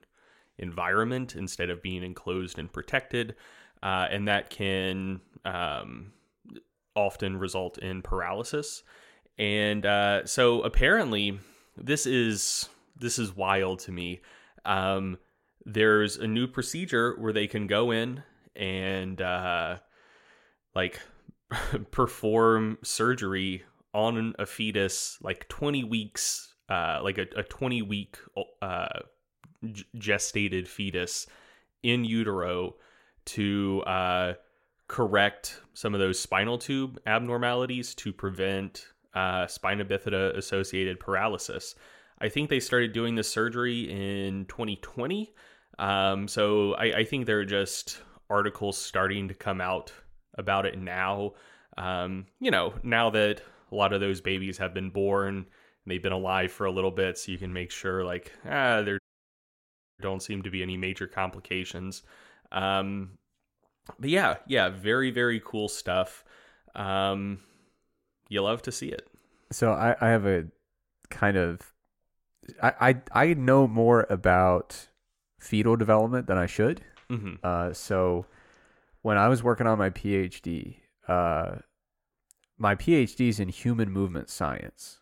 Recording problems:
audio cutting out; at 59 s for 1 s

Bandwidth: 16.5 kHz